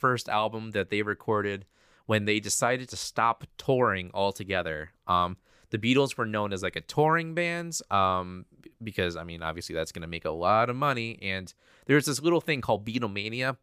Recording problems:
none

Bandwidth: 15 kHz